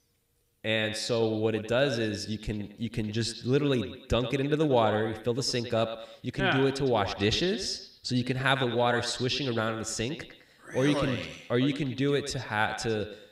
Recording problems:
echo of what is said; strong; throughout; 100 ms later, 10 dB below the speech

